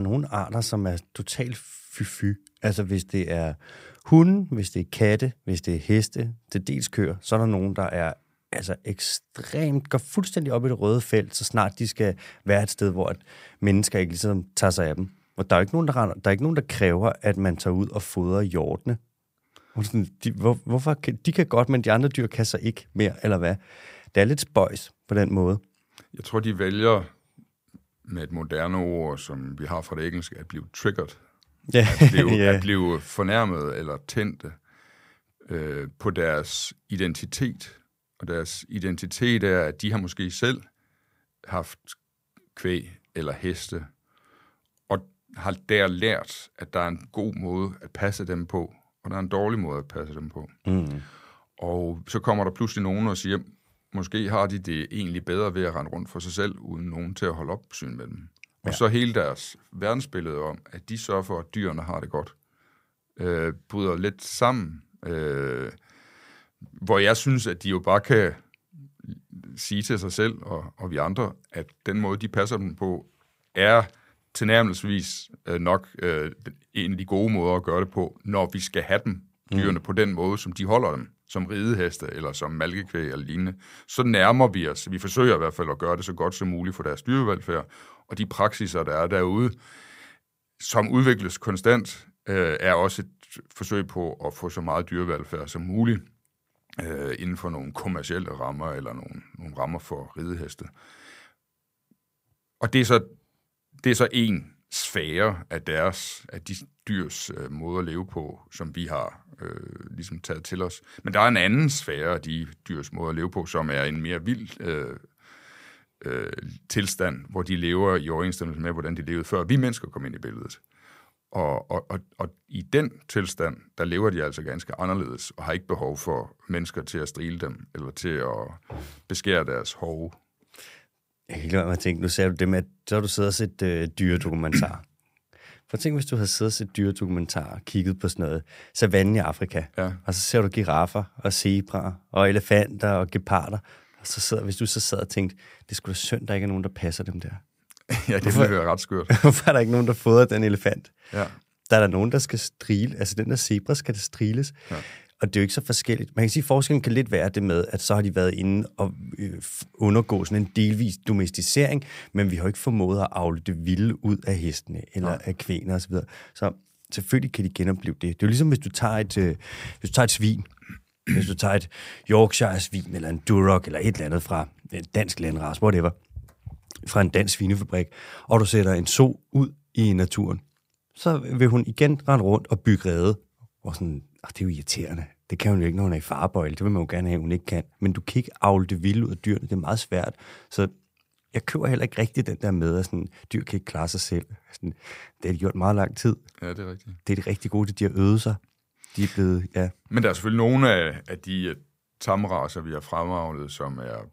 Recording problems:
abrupt cut into speech; at the start

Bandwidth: 15.5 kHz